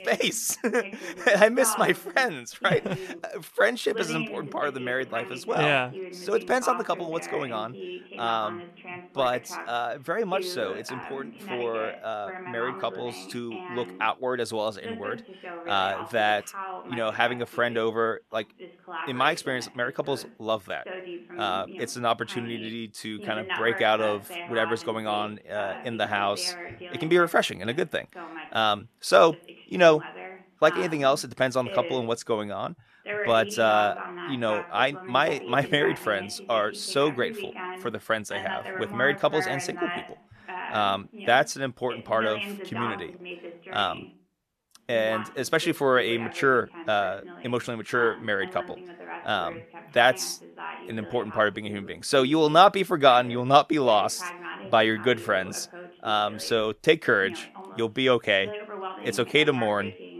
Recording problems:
voice in the background; noticeable; throughout; 10 dB below the speech

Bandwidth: 13.5 kHz